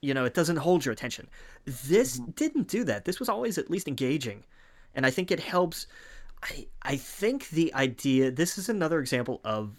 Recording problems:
uneven, jittery; strongly; from 1 to 9 s

